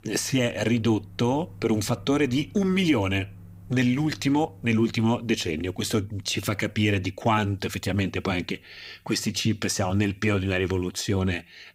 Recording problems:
household noises; faint; throughout; 20 dB below the speech

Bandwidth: 15.5 kHz